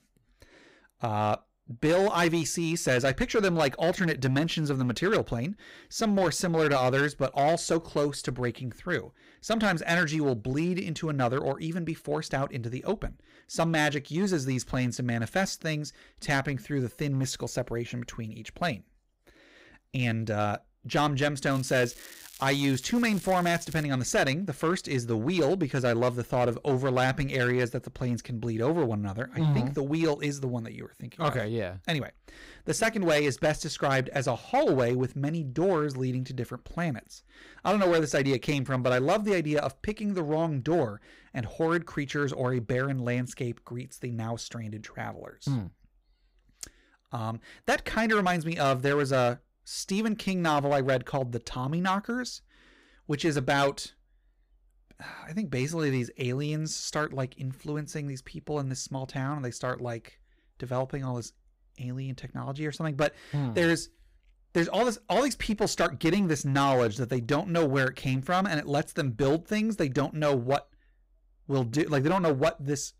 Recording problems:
distortion; slight; 5% of the sound clipped
crackling; noticeable; from 22 to 24 s; 20 dB below the speech

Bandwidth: 15.5 kHz